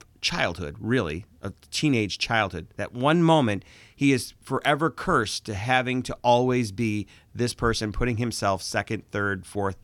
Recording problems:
none

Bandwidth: 17.5 kHz